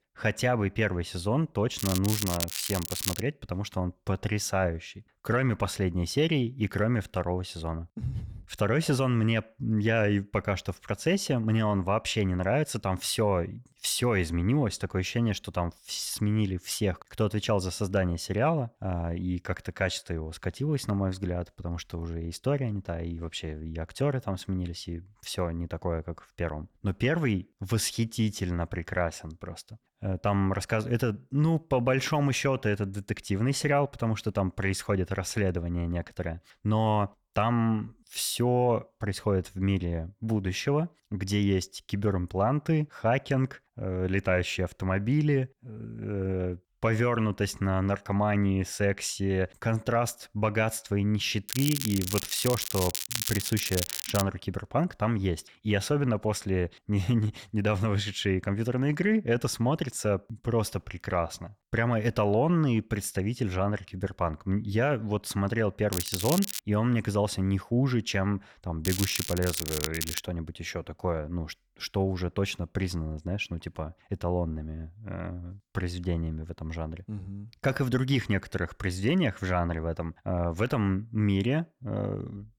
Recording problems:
crackling; loud; 4 times, first at 2 s; 3 dB below the speech

